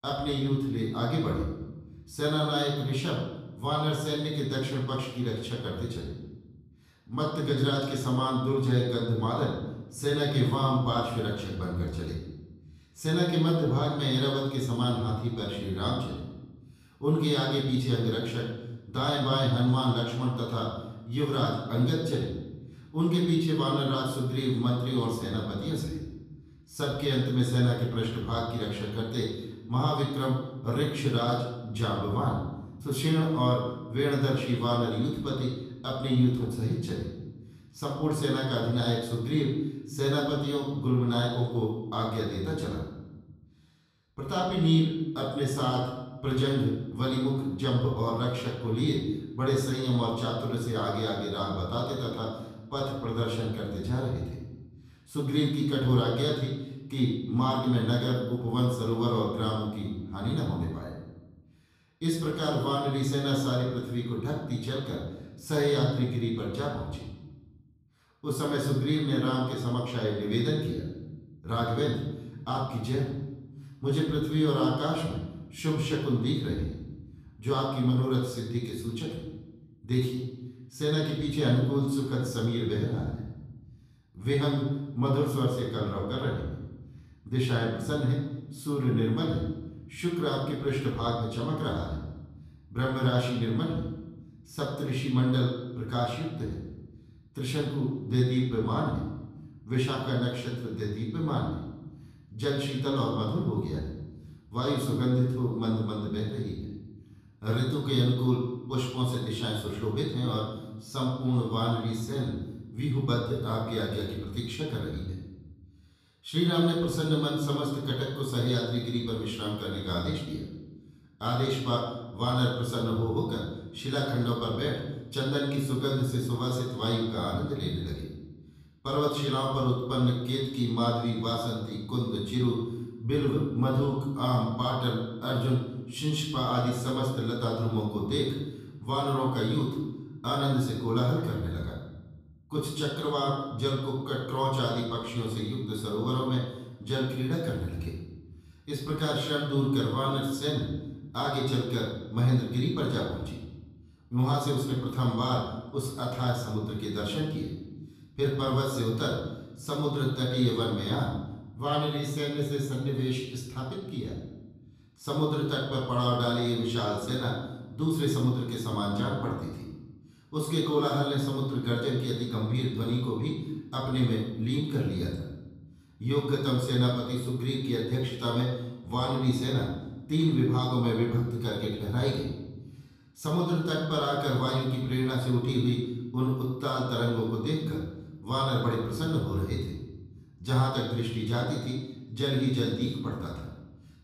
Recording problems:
off-mic speech; far
room echo; noticeable; dies away in 1 s

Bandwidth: 14.5 kHz